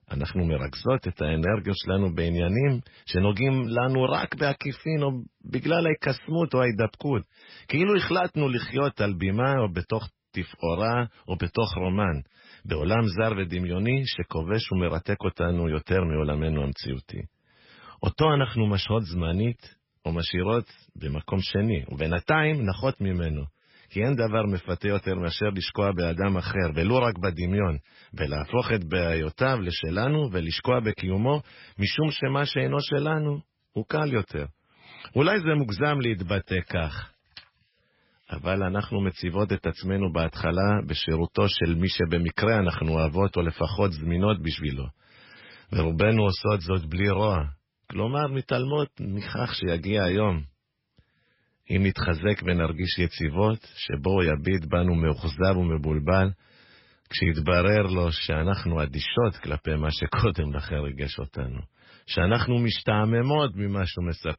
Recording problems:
garbled, watery; badly; nothing above 5.5 kHz

